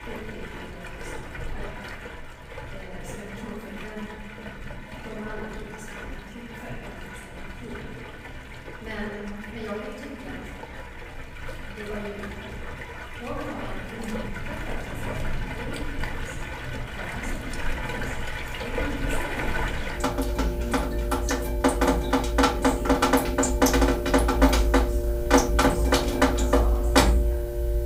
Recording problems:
room echo; strong; dies away in 1.6 s
off-mic speech; far
rain or running water; very loud; throughout; 15 dB above the speech

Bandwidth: 15.5 kHz